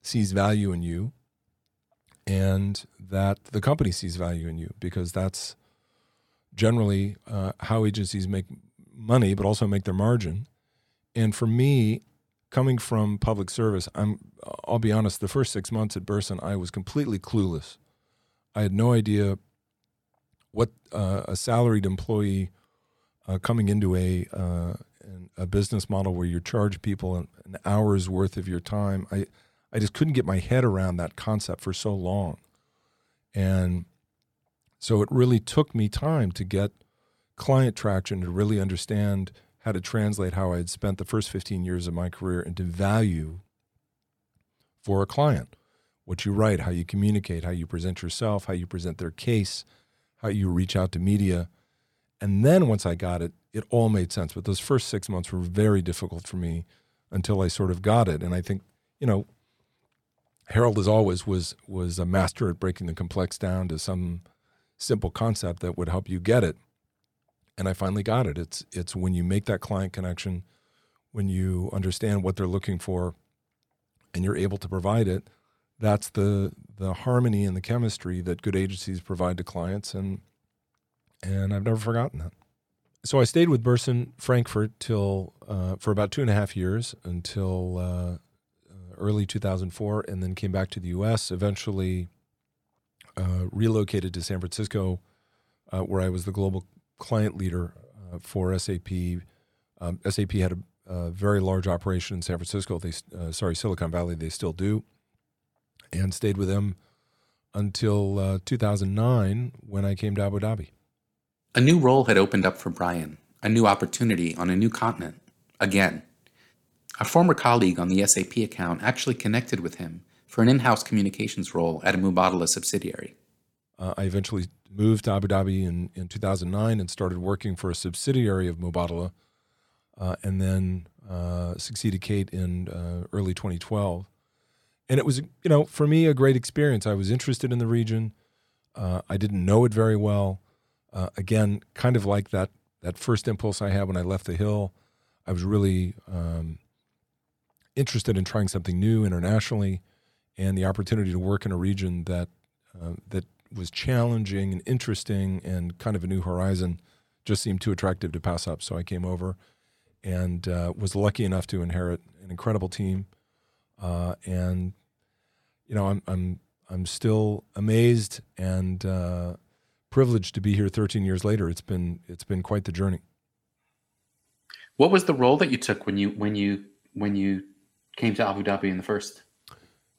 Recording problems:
none

